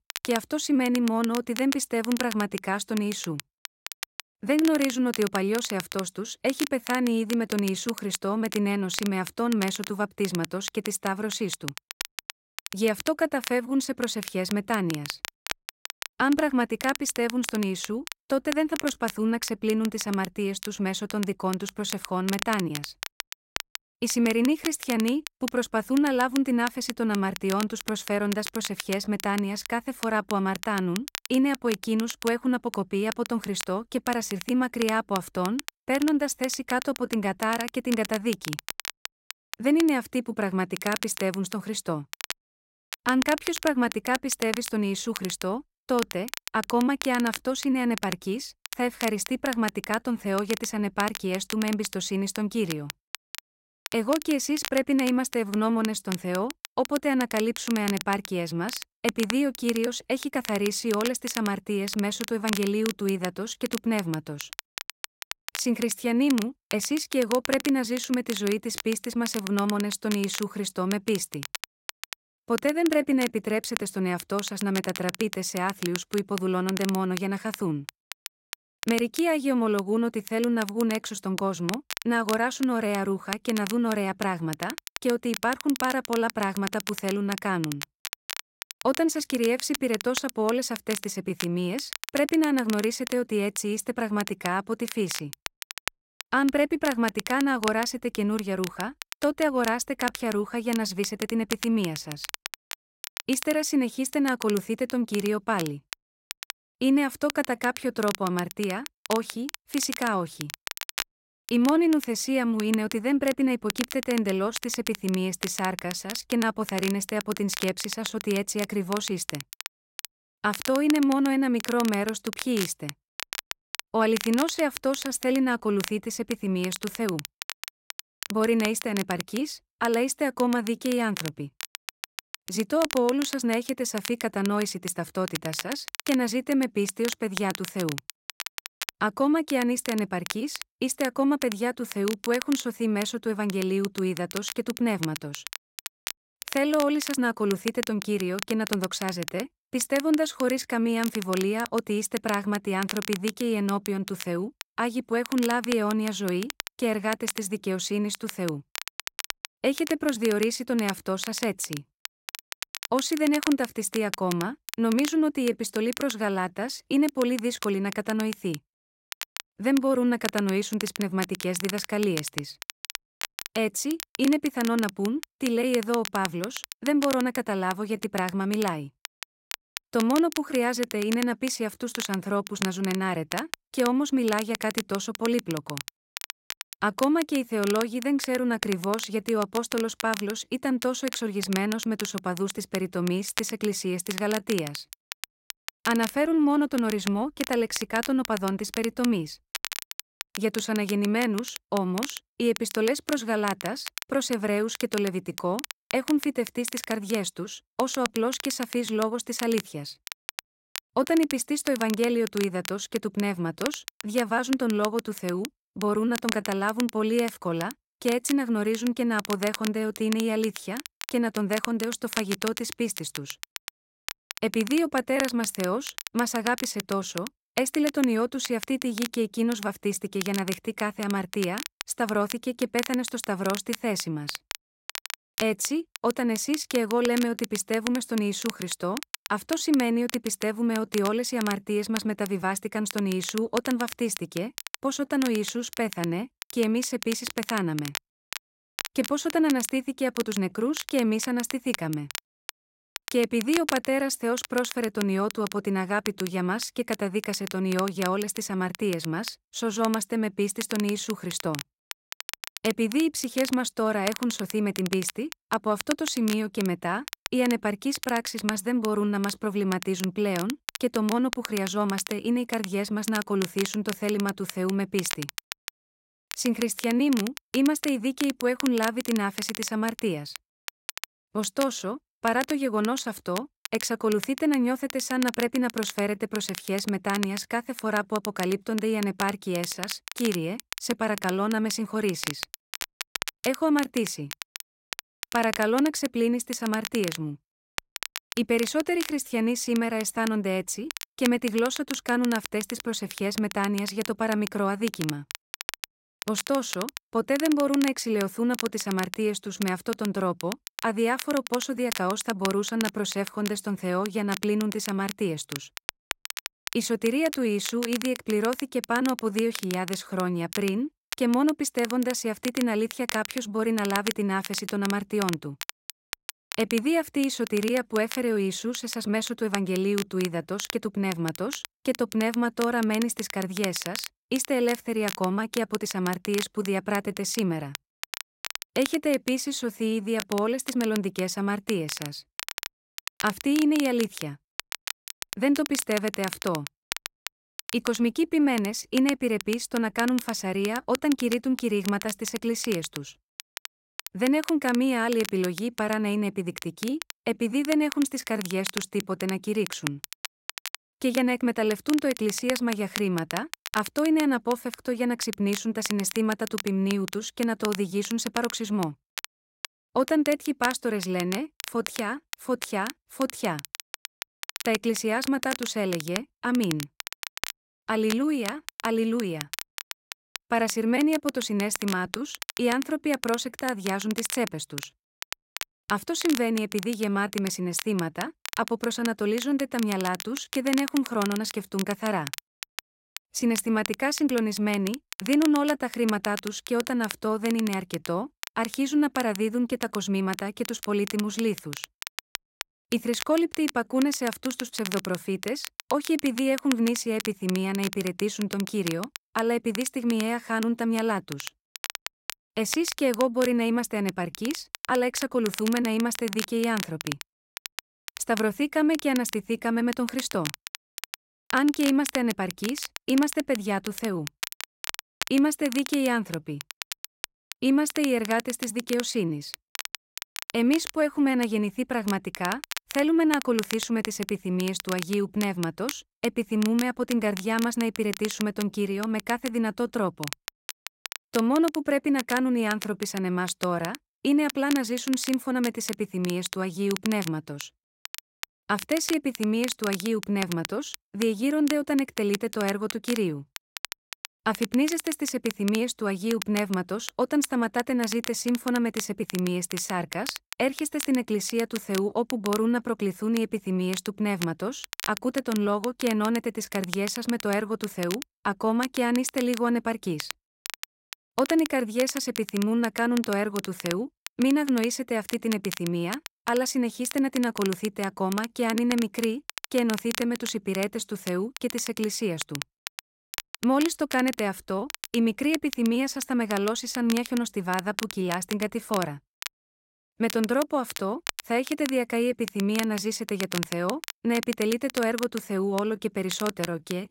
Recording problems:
crackle, like an old record; noticeable; 10 dB below the speech

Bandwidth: 16 kHz